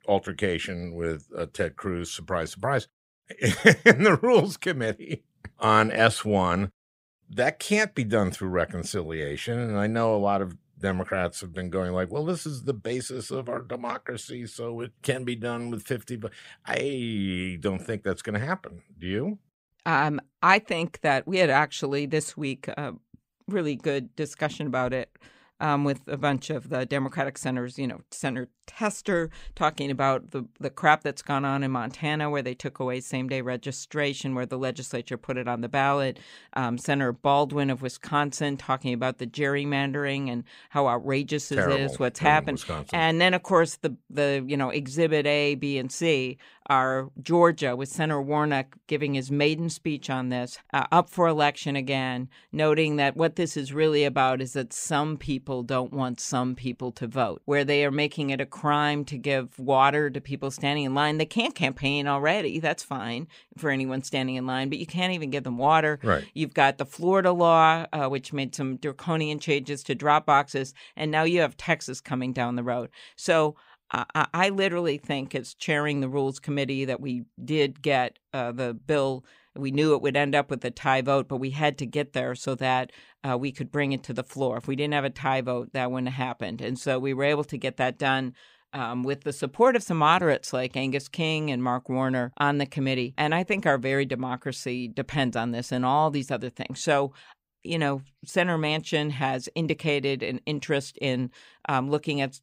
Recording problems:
none

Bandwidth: 15.5 kHz